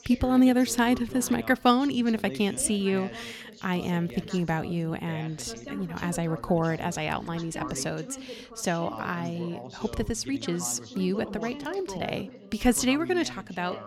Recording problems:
background chatter; noticeable; throughout; 2 voices, 15 dB below the speech

